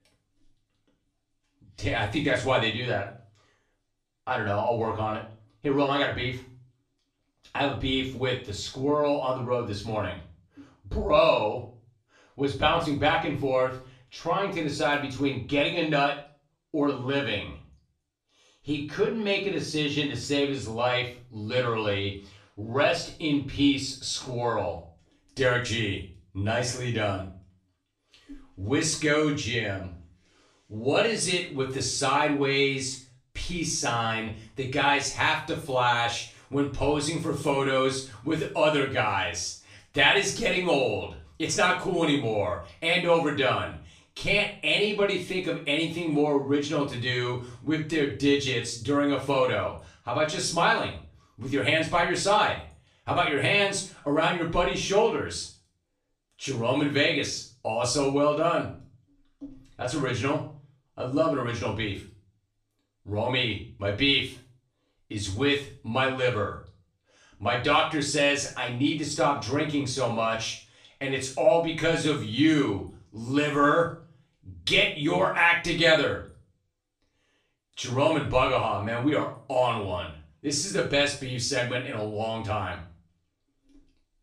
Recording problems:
off-mic speech; far
room echo; slight; dies away in 0.4 s

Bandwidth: 14.5 kHz